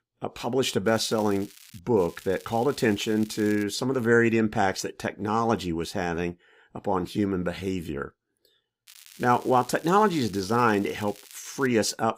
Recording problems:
crackling; faint; at 1 s, from 2 to 3.5 s and from 9 to 12 s; 20 dB below the speech

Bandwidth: 15.5 kHz